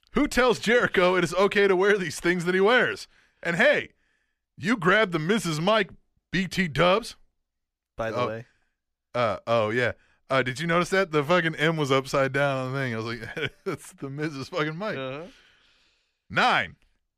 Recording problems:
none

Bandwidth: 14.5 kHz